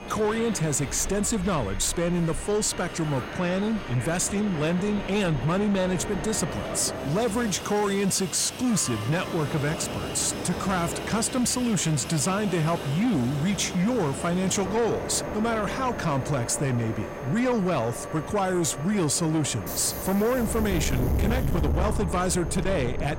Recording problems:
distortion; slight; 10 dB below the speech
train or aircraft noise; loud; throughout; 7 dB below the speech
high-pitched whine; faint; throughout; 6.5 kHz, 35 dB below the speech

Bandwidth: 16 kHz